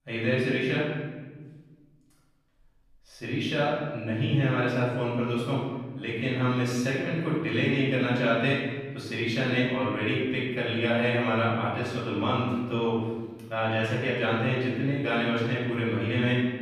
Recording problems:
off-mic speech; far
room echo; noticeable; dies away in 1.3 s

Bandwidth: 14.5 kHz